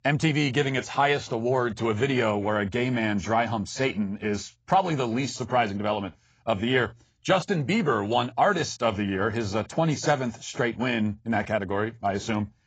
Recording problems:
garbled, watery; badly; nothing above 7.5 kHz

